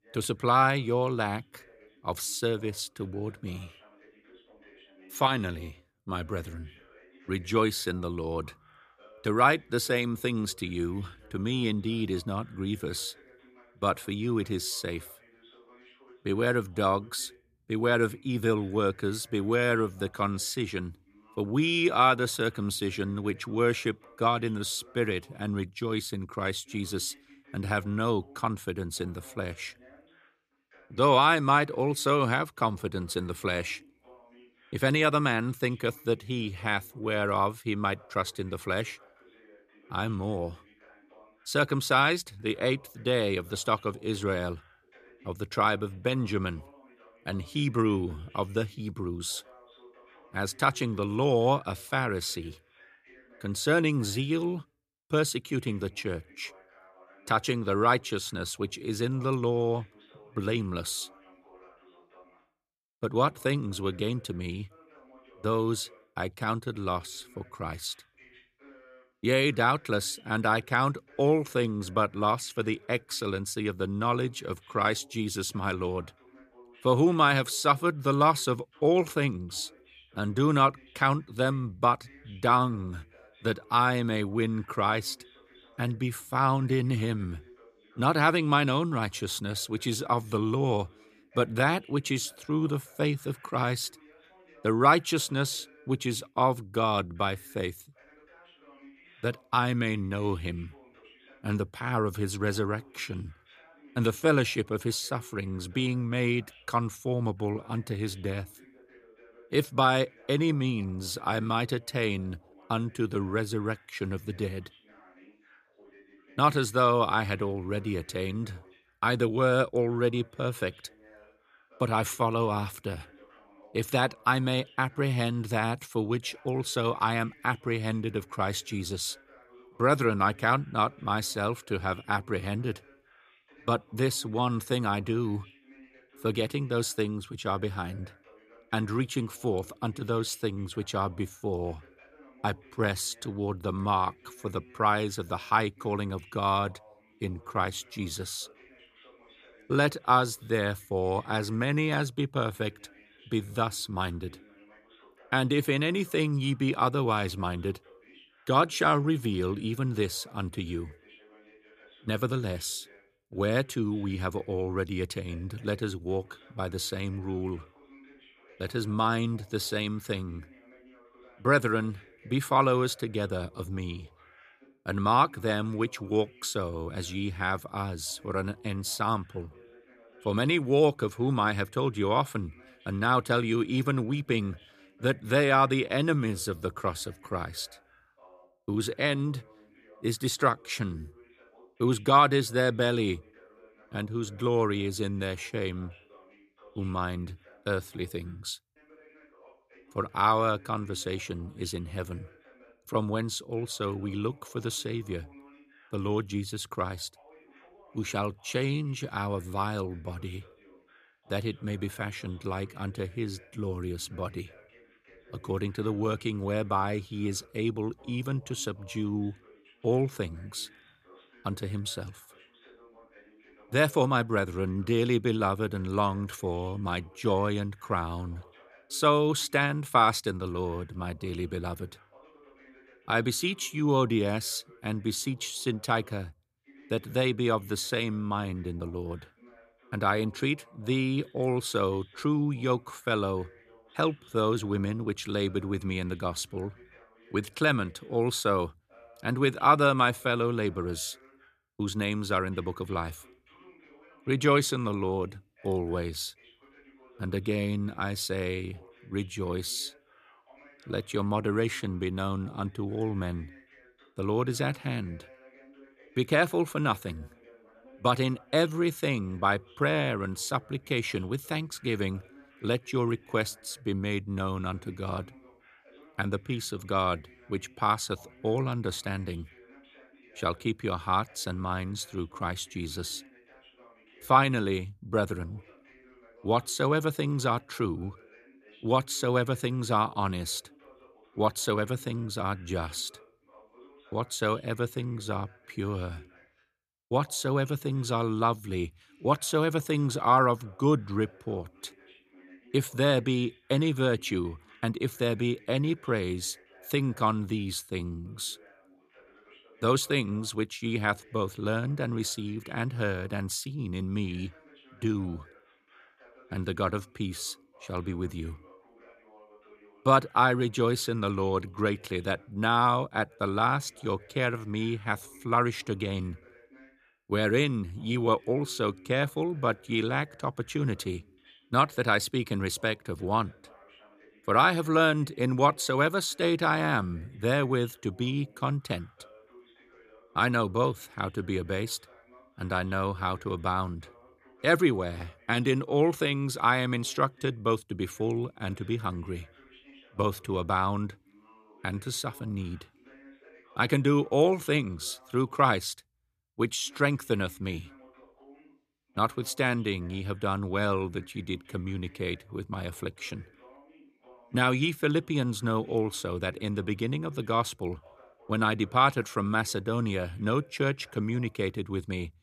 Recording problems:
voice in the background; faint; throughout; 30 dB below the speech

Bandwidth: 14.5 kHz